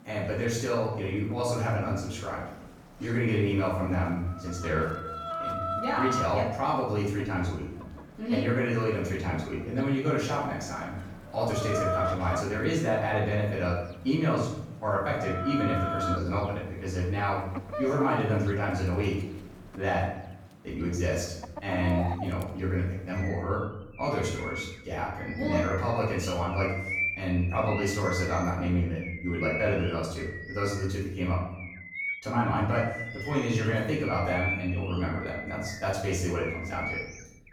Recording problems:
off-mic speech; far
room echo; noticeable; dies away in 0.7 s
animal sounds; loud; throughout; 6 dB below the speech

